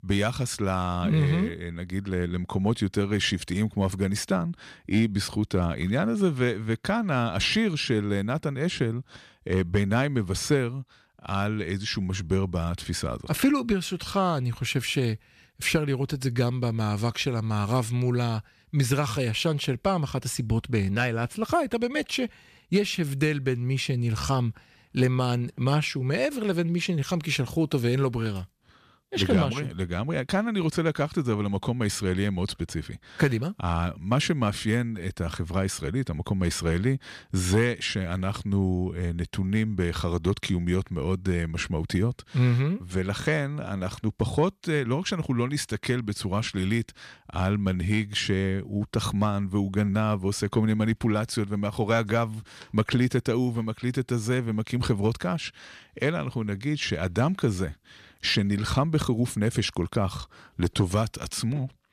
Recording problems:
none

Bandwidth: 14.5 kHz